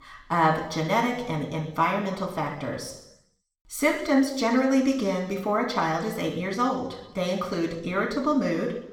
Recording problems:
room echo; noticeable; dies away in 0.8 s
off-mic speech; somewhat distant

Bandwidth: 18 kHz